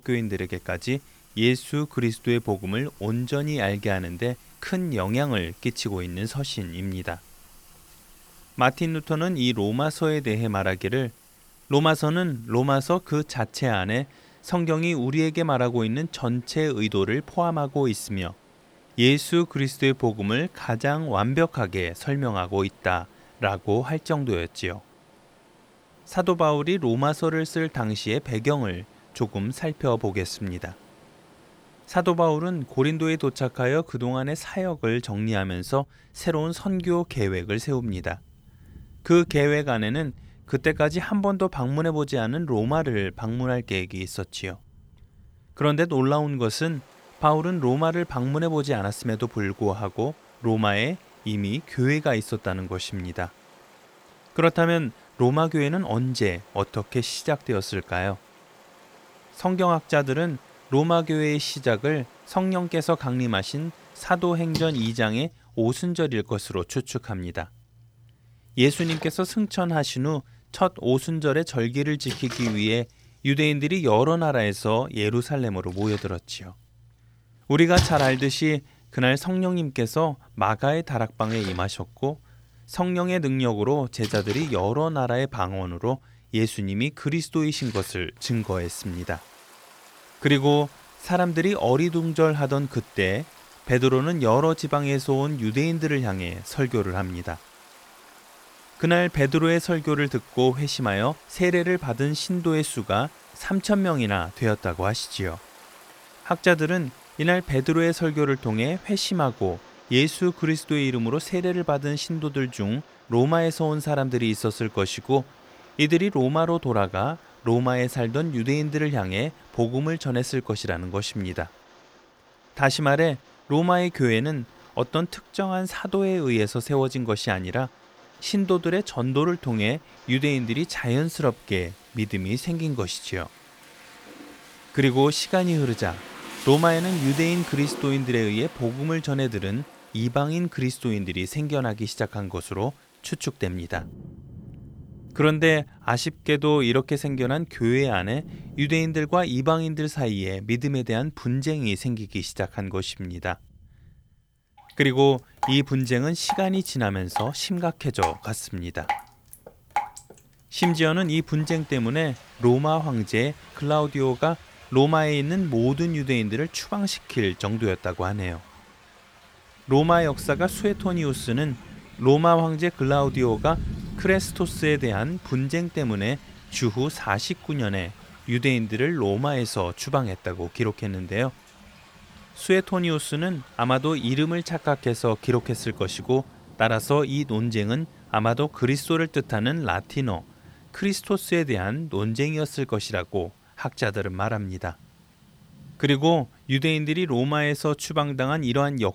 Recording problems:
rain or running water; noticeable; throughout; 15 dB below the speech

